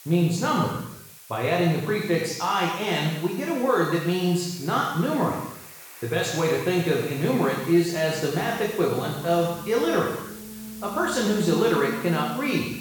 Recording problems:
room echo; strong; dies away in 0.9 s
off-mic speech; far
alarms or sirens; noticeable; throughout; 15 dB below the speech
hiss; noticeable; throughout; 15 dB below the speech

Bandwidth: 19 kHz